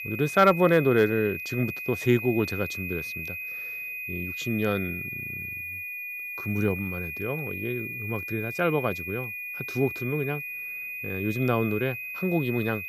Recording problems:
high-pitched whine; loud; throughout; 2.5 kHz, 6 dB below the speech

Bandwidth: 14.5 kHz